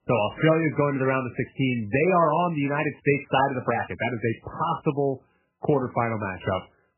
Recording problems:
garbled, watery; badly; nothing above 3 kHz

